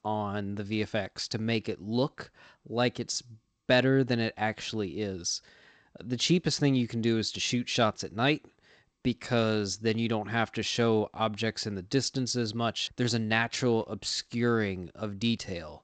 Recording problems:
garbled, watery; slightly; nothing above 7.5 kHz

